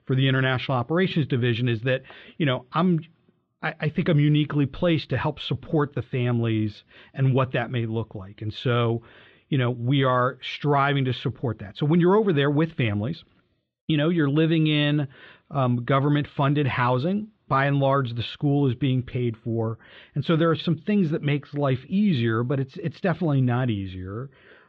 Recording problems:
muffled; very; fading above 3.5 kHz

